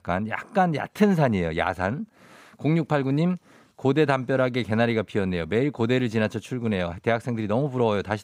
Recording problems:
none

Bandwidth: 15.5 kHz